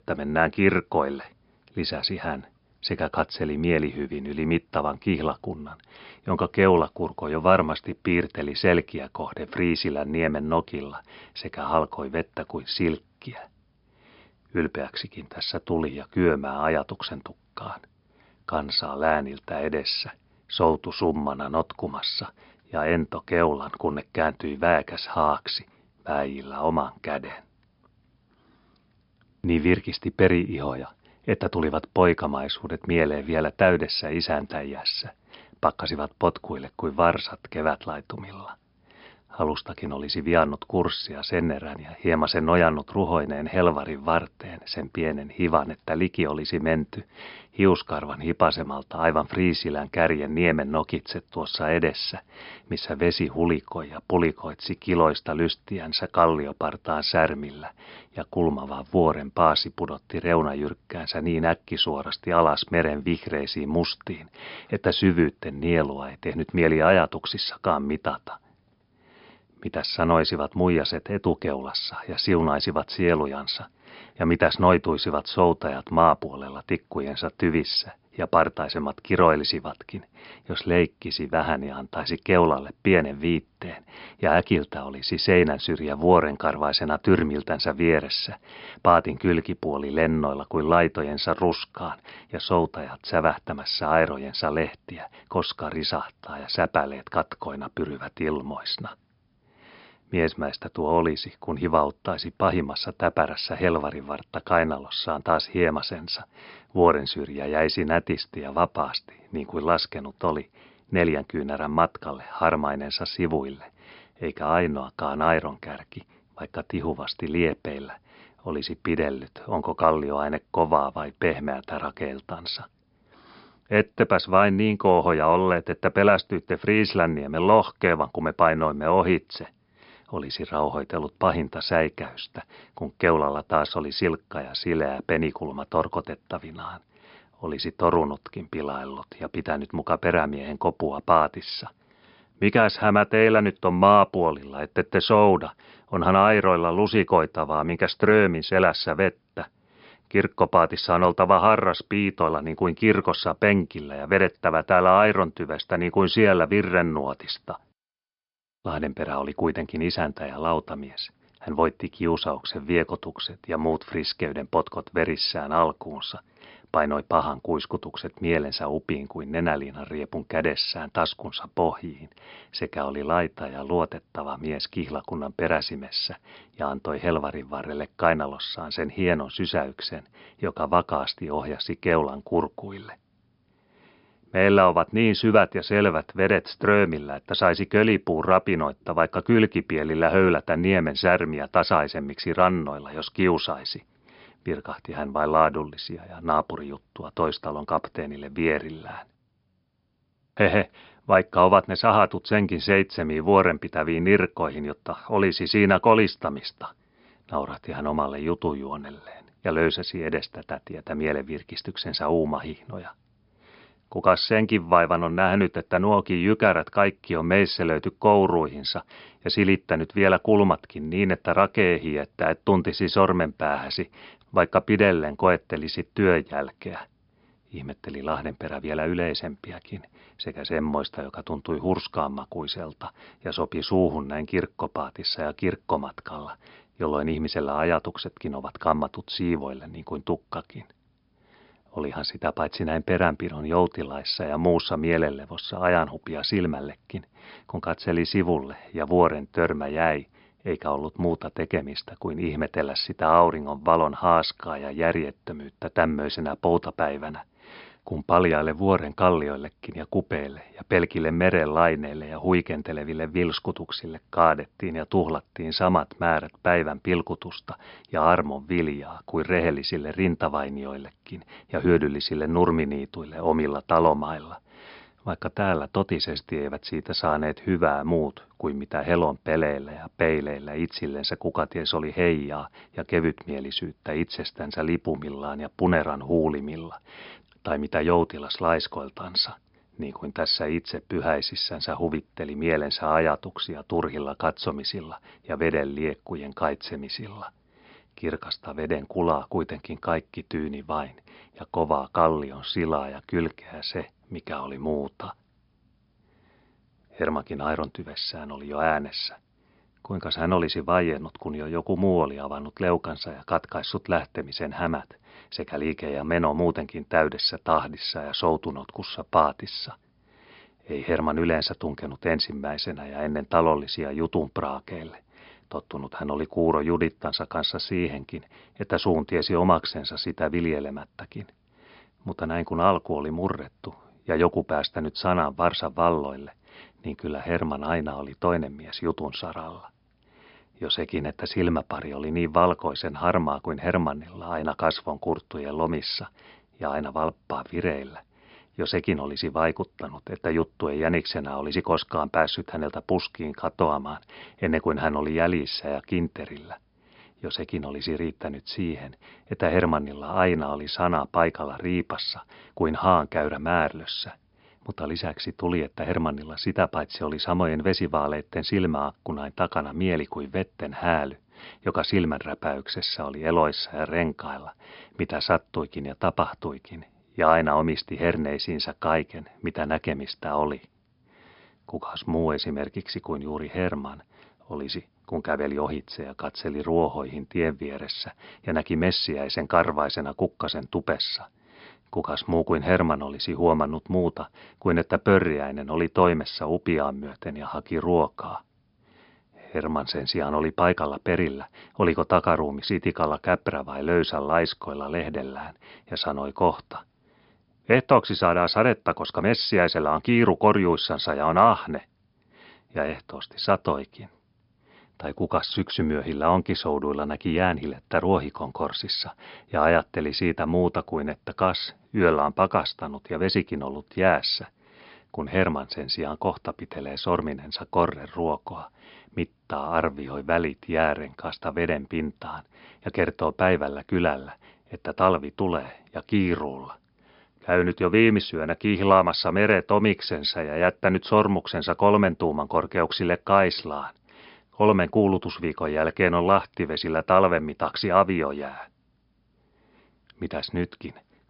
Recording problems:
high frequencies cut off; noticeable; nothing above 5.5 kHz

